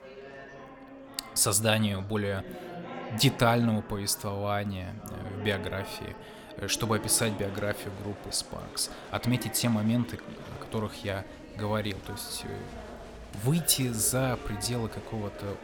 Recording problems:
chatter from many people; noticeable; throughout; 15 dB below the speech

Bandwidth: 18 kHz